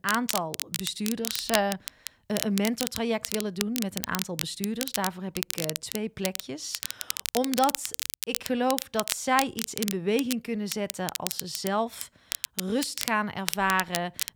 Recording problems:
crackle, like an old record; loud; 3 dB below the speech

